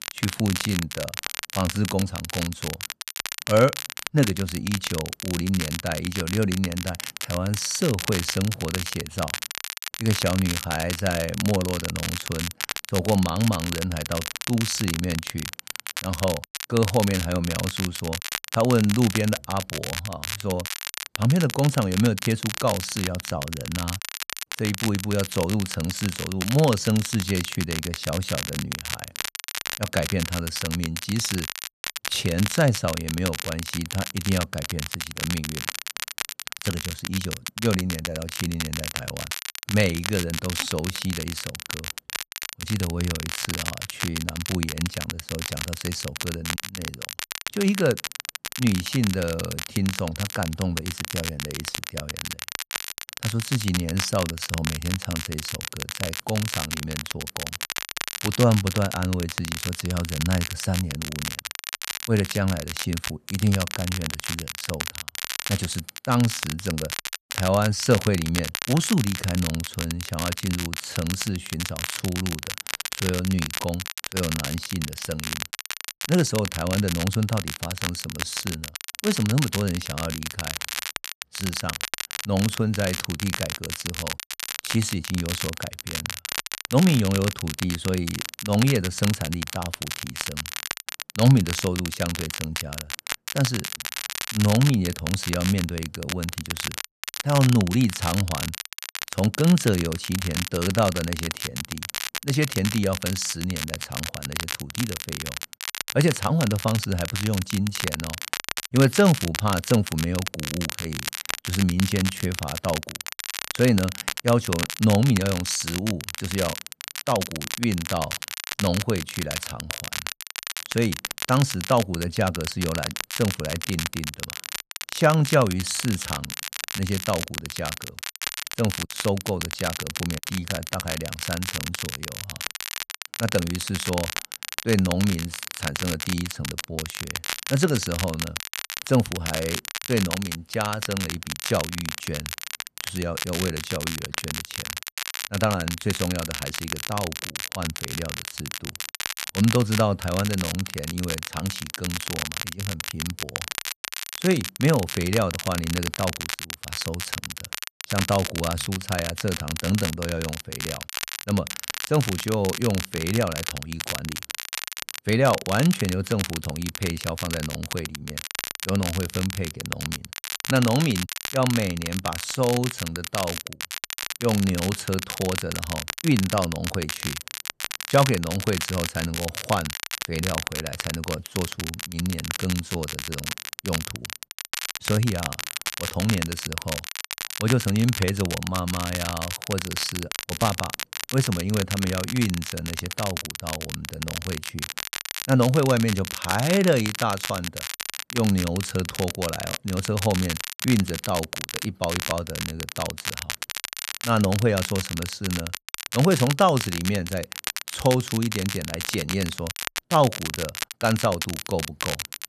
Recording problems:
crackle, like an old record; loud; 5 dB below the speech

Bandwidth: 13.5 kHz